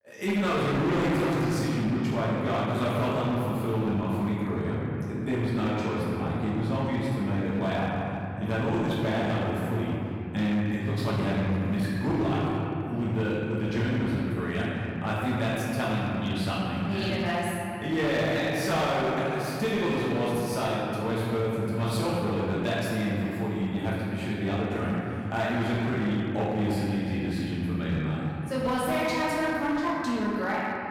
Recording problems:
room echo; strong; dies away in 3 s
off-mic speech; far
distortion; slight; 14% of the sound clipped

